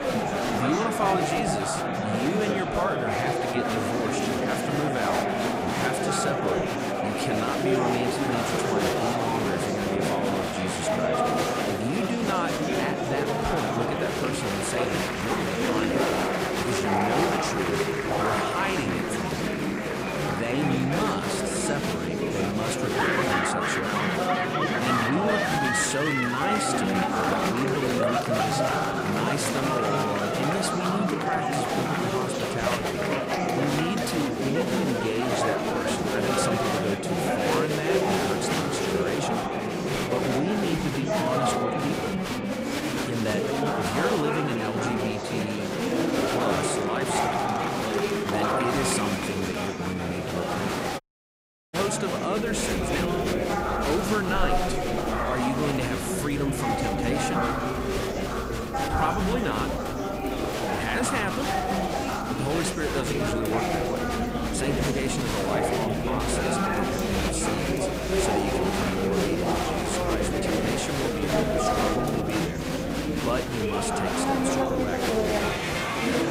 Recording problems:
murmuring crowd; very loud; throughout; 5 dB above the speech
audio cutting out; at 51 s for 0.5 s

